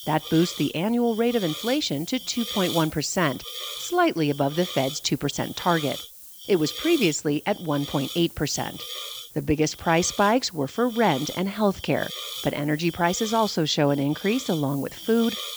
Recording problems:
high frequencies cut off; noticeable; nothing above 8 kHz
hiss; noticeable; throughout; 10 dB below the speech

